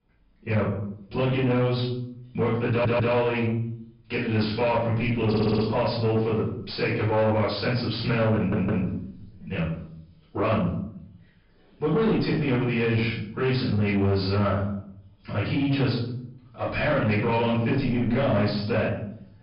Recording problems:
off-mic speech; far
room echo; noticeable; dies away in 0.6 s
high frequencies cut off; noticeable; nothing above 5.5 kHz
distortion; slight; 10 dB below the speech
audio stuttering; at 2.5 s, at 5.5 s and at 8.5 s

